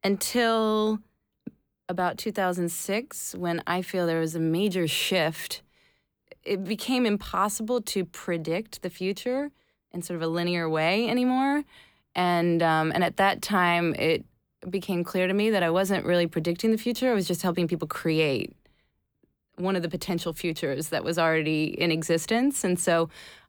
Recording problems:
none

